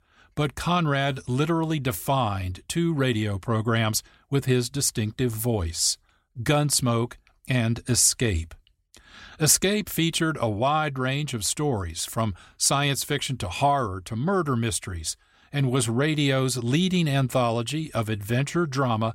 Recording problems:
none

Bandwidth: 16 kHz